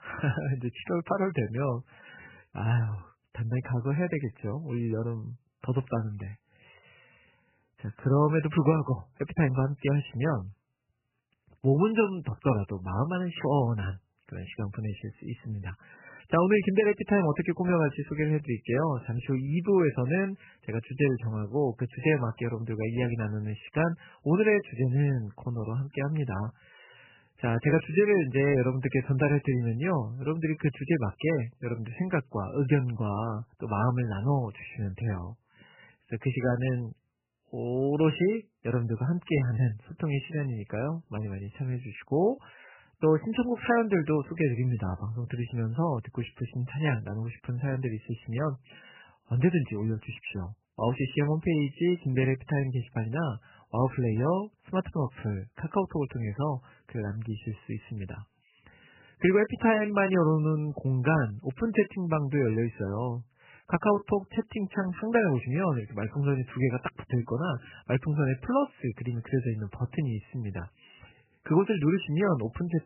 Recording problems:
garbled, watery; badly; nothing above 3 kHz

